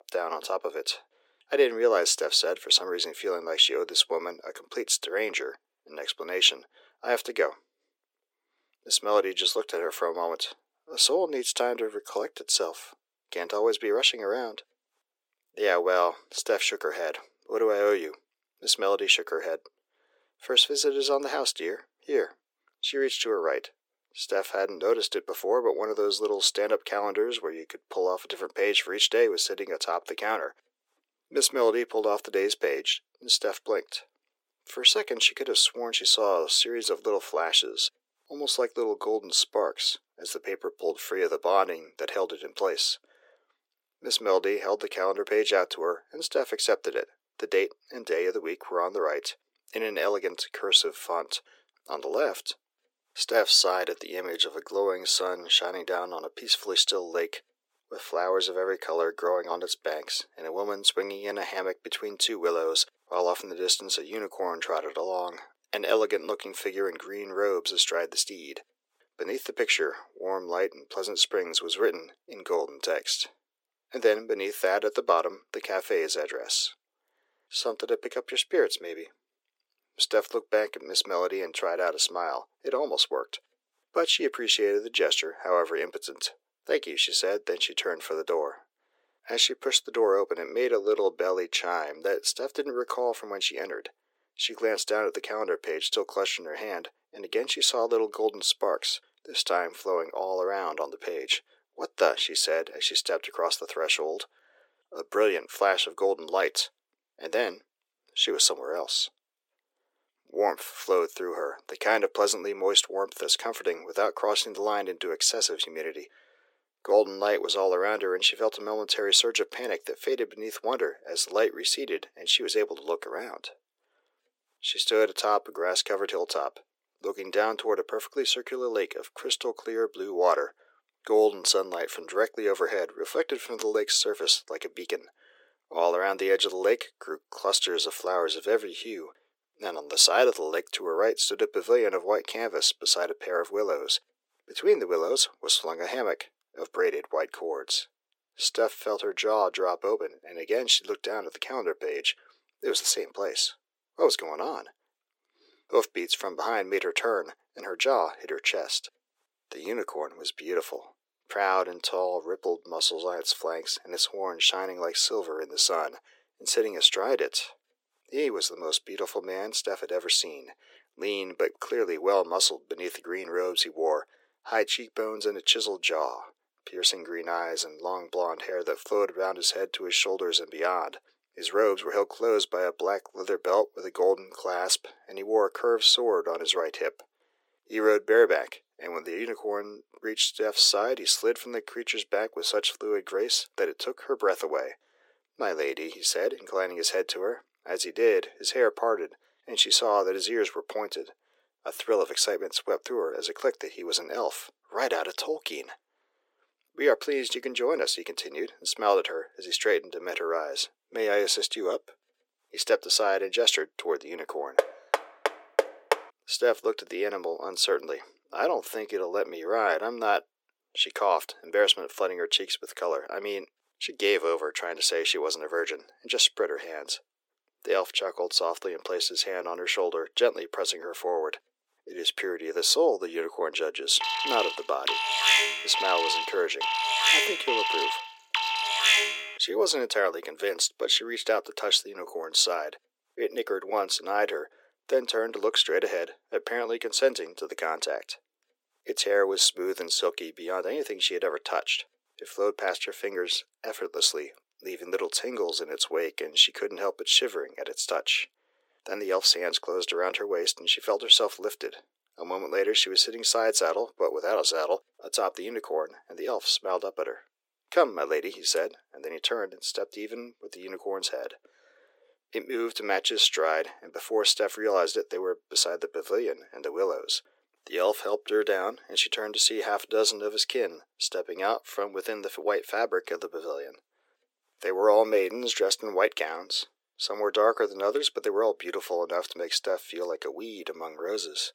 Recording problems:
thin; very; fading below 350 Hz
door banging; noticeable; from 3:35 to 3:36; peak level with the speech
alarm; loud; from 3:54 to 3:59; peak 7 dB above the speech

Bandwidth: 16.5 kHz